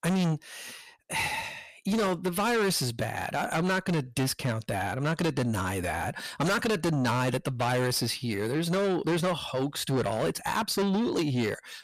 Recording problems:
distortion; heavy; 6 dB below the speech

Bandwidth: 14.5 kHz